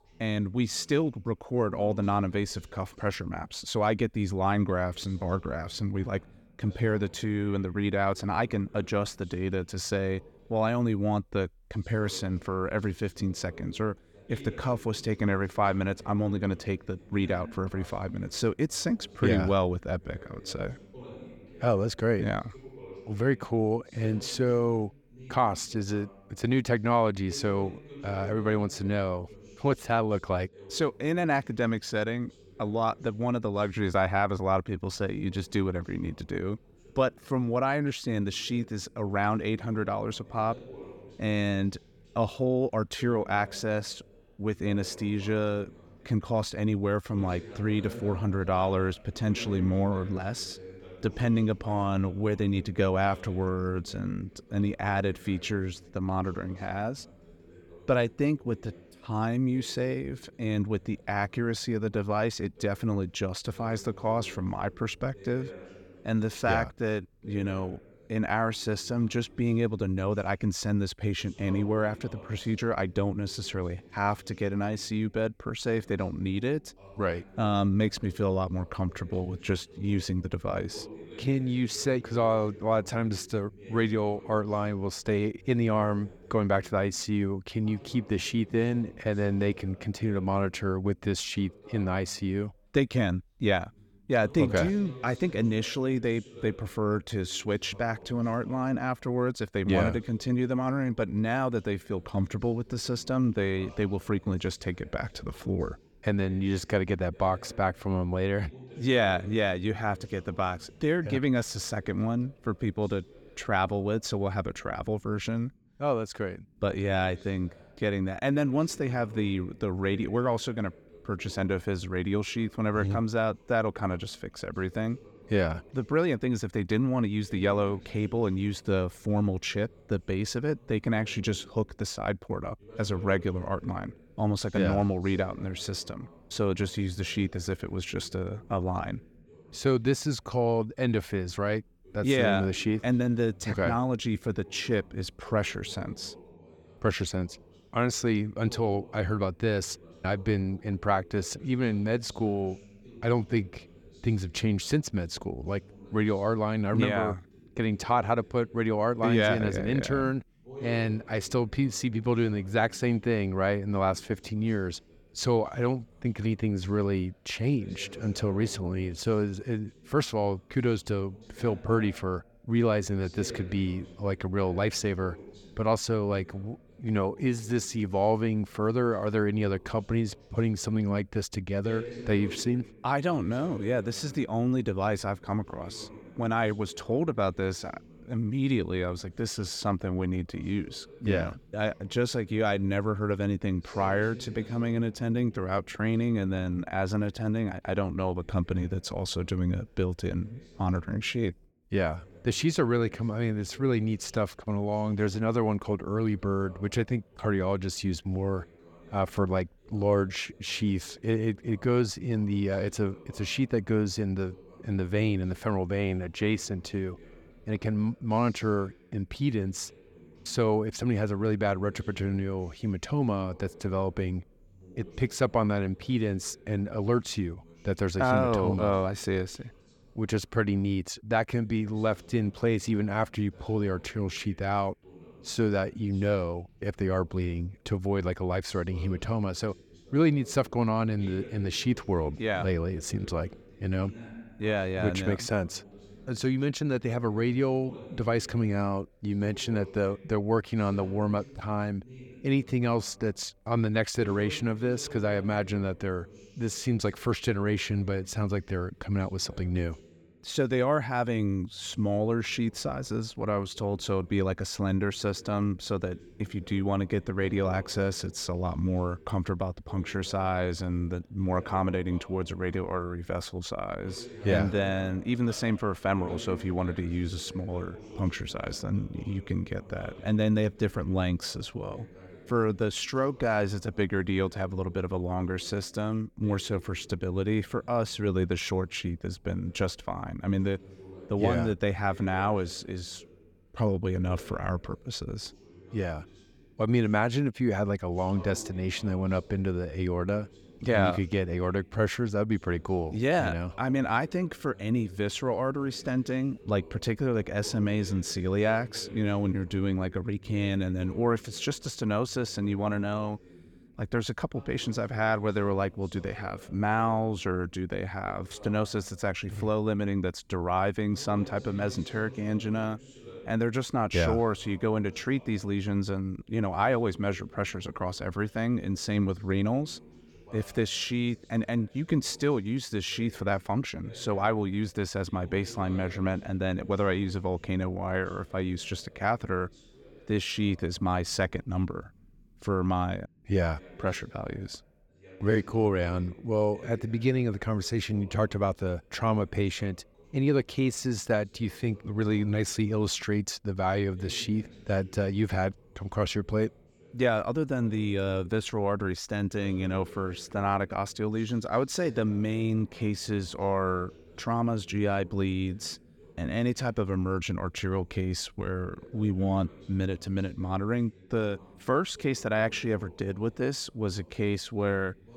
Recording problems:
voice in the background; faint; throughout; 20 dB below the speech

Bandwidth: 18 kHz